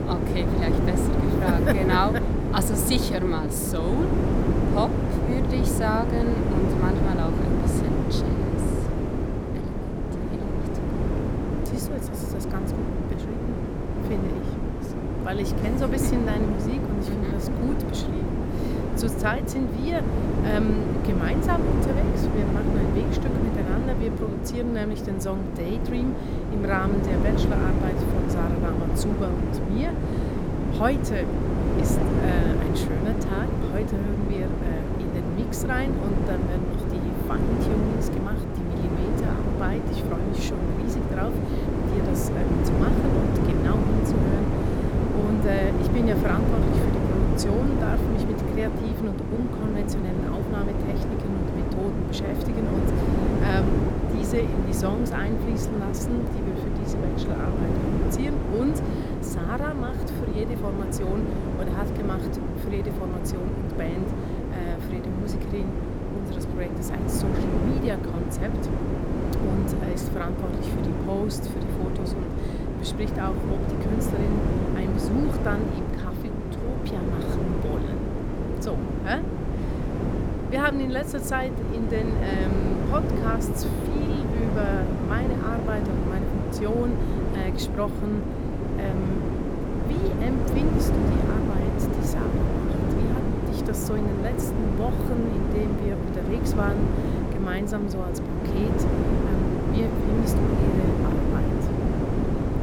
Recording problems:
wind noise on the microphone; heavy; 1 dB above the speech

